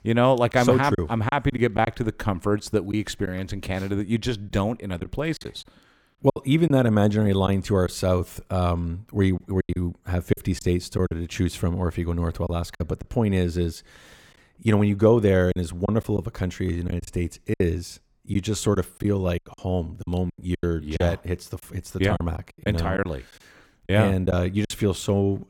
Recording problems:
choppy; very; 7% of the speech affected

